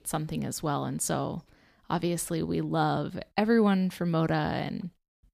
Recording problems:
none

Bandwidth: 15 kHz